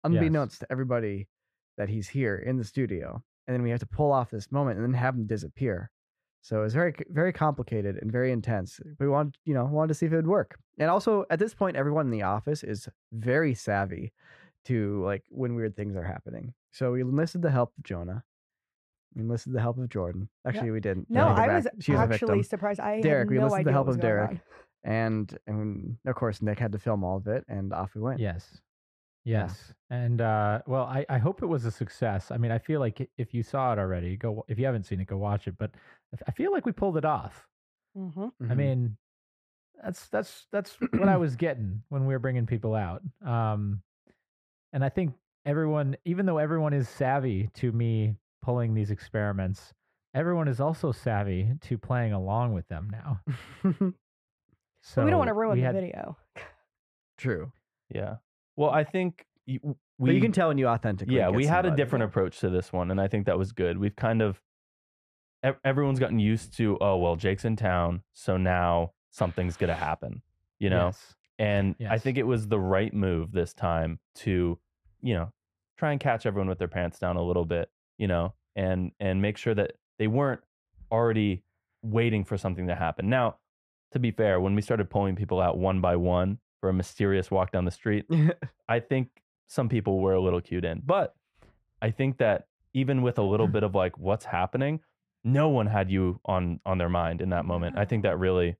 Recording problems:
muffled; slightly; fading above 3 kHz

